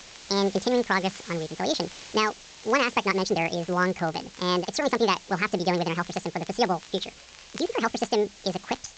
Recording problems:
wrong speed and pitch; too fast and too high; 1.7 times normal speed
high frequencies cut off; noticeable; nothing above 8 kHz
hiss; noticeable; throughout; 20 dB below the speech
crackle, like an old record; faint; 25 dB below the speech

